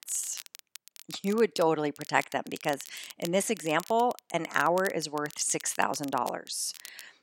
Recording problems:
crackle, like an old record; noticeable; 15 dB below the speech

